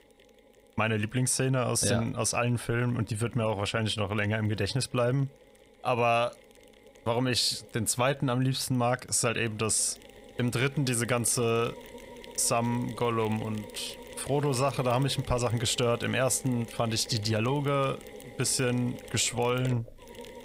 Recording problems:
machinery noise; noticeable; throughout; 20 dB below the speech

